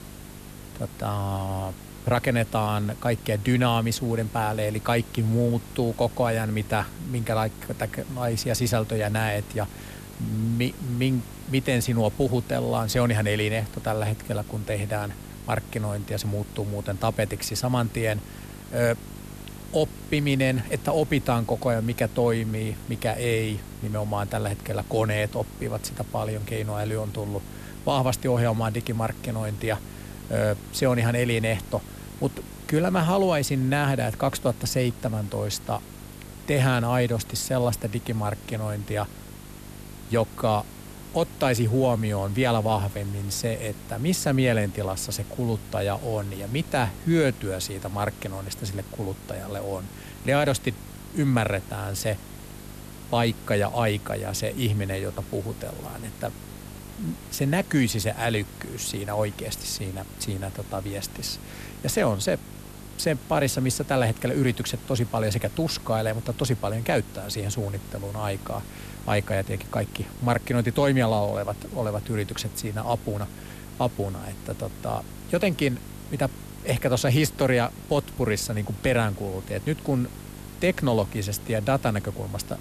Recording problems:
hiss; noticeable; throughout; 20 dB below the speech
electrical hum; faint; throughout; 50 Hz, 25 dB below the speech

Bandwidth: 14 kHz